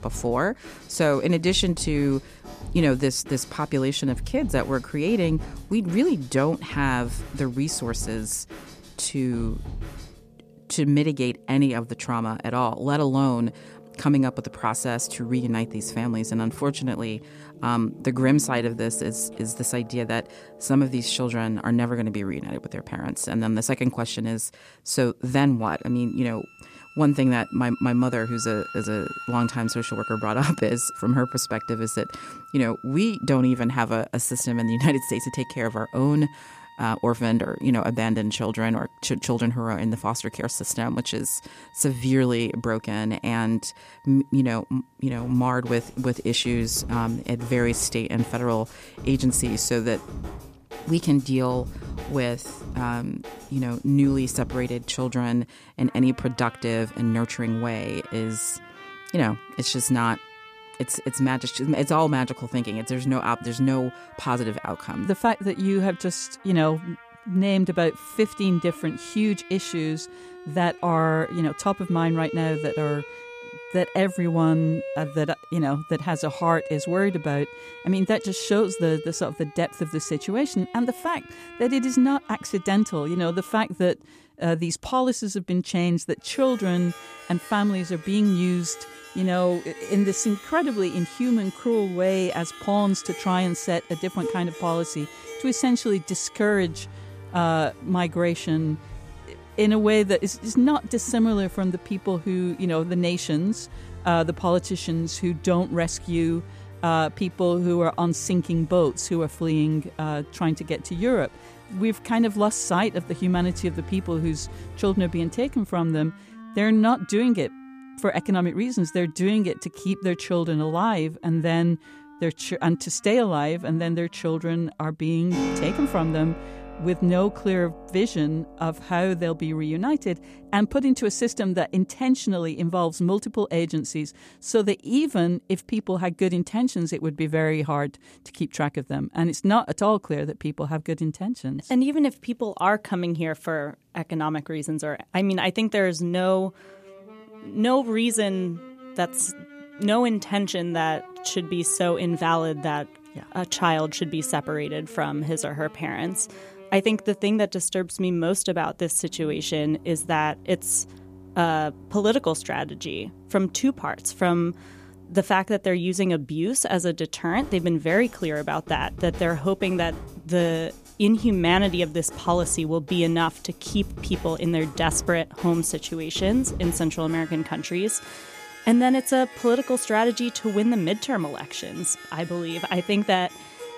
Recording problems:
background music; noticeable; throughout; 15 dB below the speech

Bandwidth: 14.5 kHz